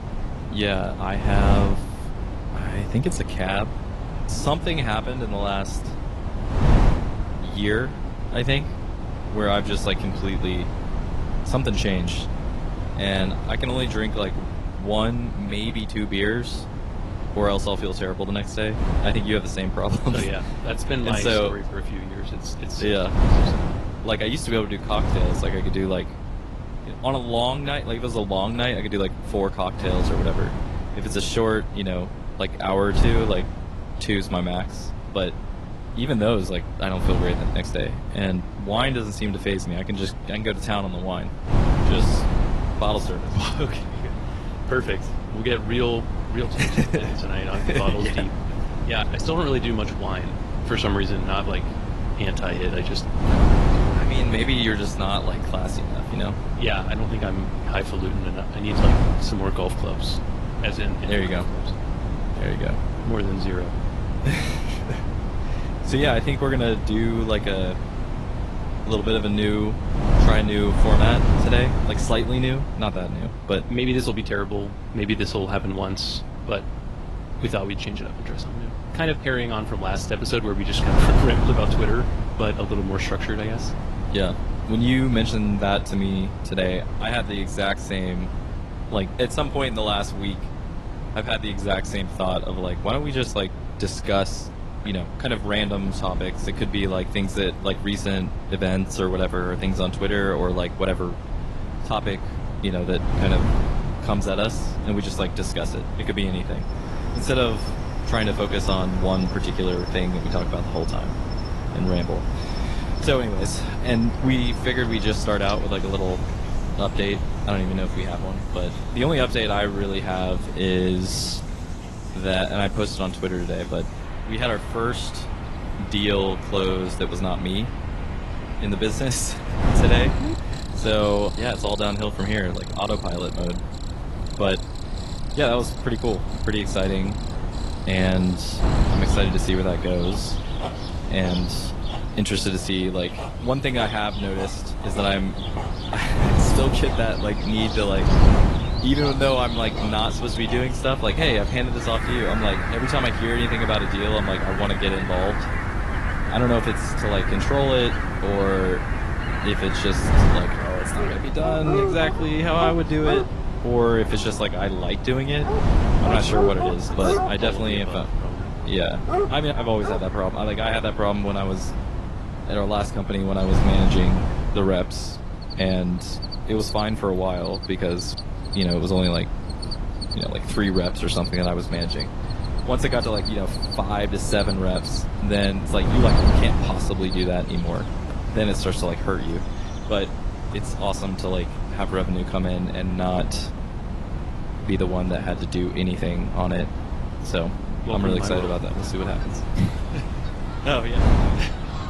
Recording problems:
garbled, watery; slightly; nothing above 11.5 kHz
wind noise on the microphone; heavy; 9 dB below the speech
animal sounds; loud; from 1:47 on; 9 dB below the speech

